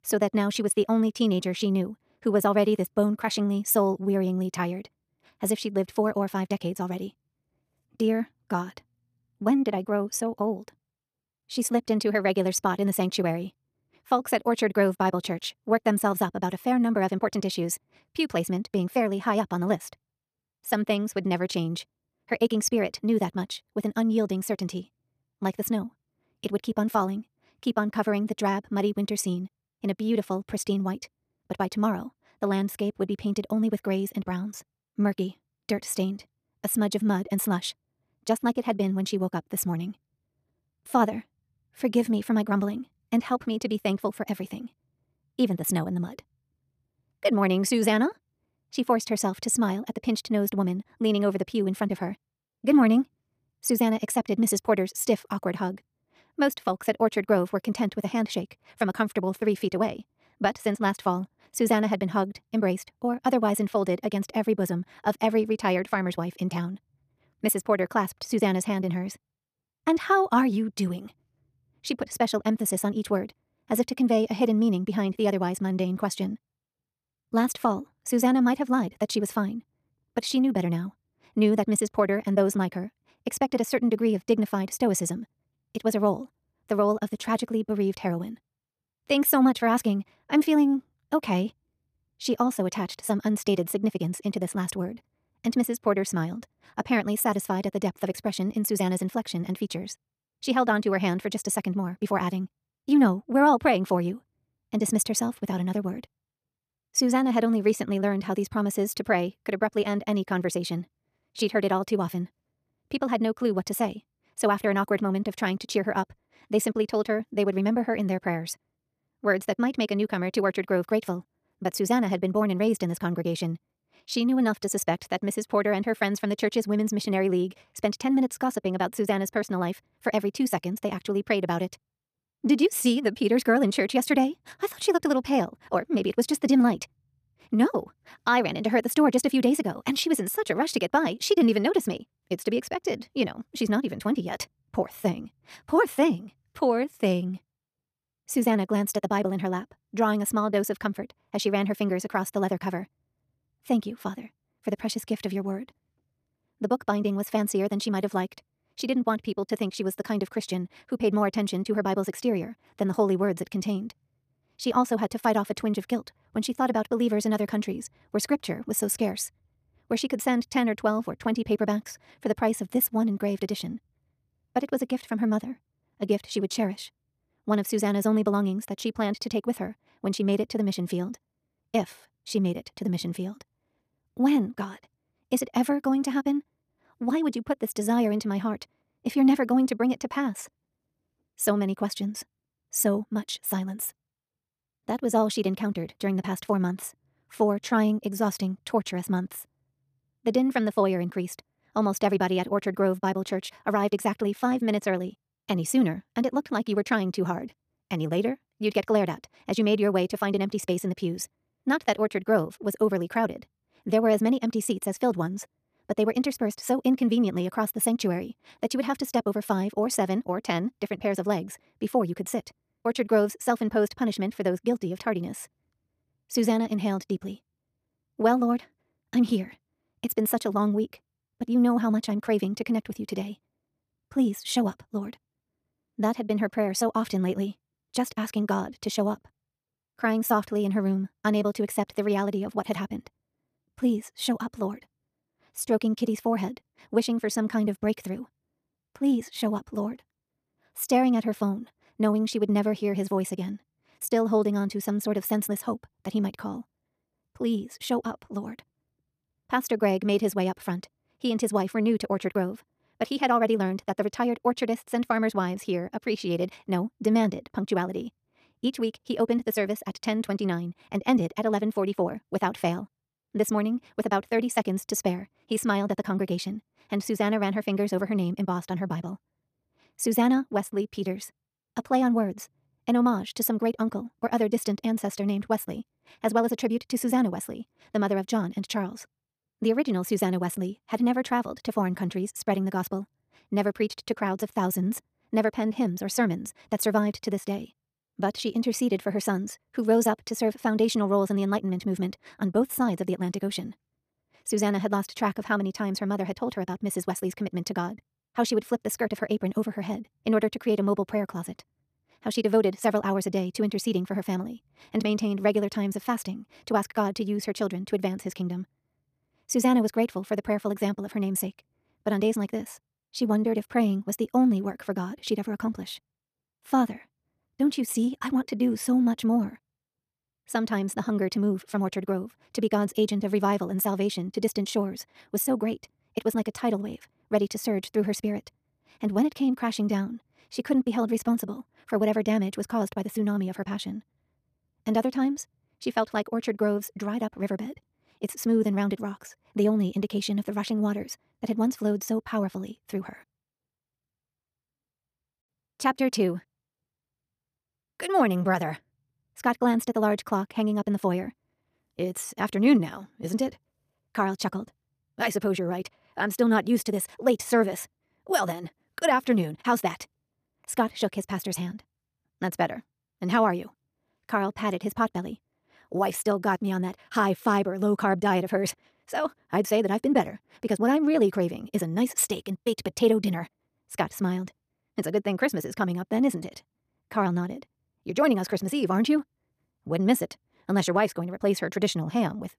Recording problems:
wrong speed, natural pitch; too fast; 1.6 times normal speed

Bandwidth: 14.5 kHz